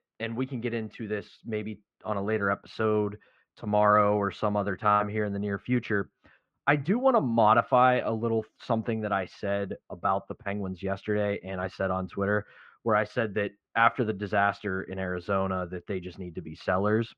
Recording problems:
muffled; very; fading above 2.5 kHz

